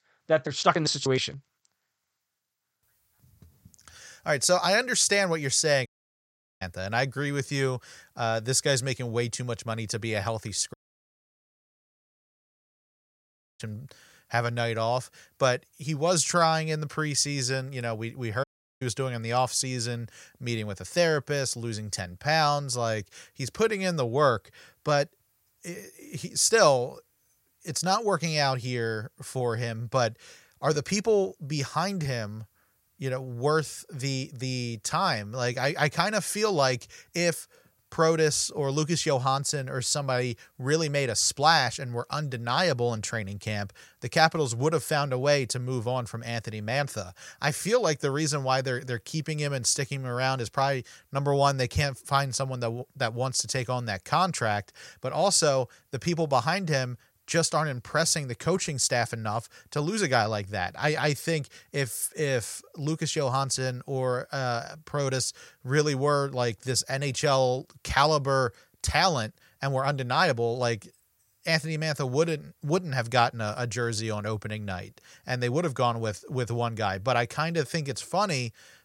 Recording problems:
audio cutting out; at 6 s for 1 s, at 11 s for 3 s and at 18 s

